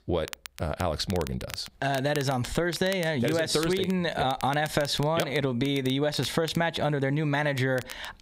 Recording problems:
squashed, flat; heavily
crackle, like an old record; noticeable; 15 dB below the speech

